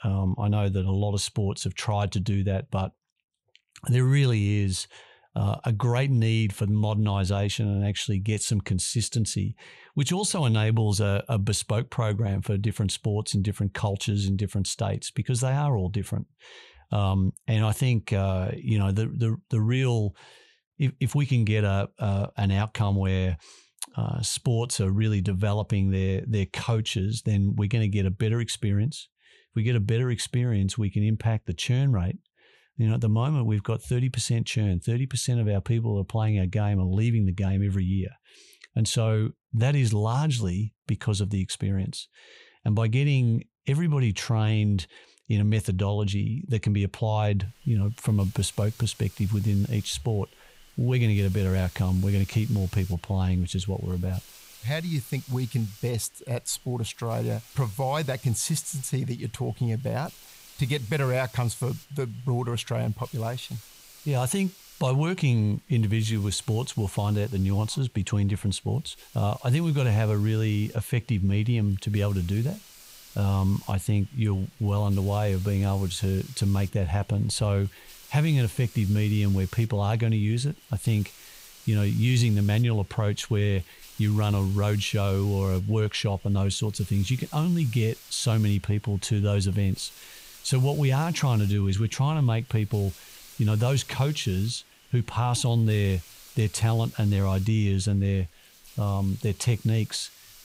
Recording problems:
hiss; faint; from 47 s on; 20 dB below the speech

